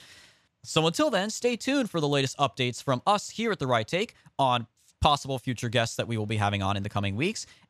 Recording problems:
none

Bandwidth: 14.5 kHz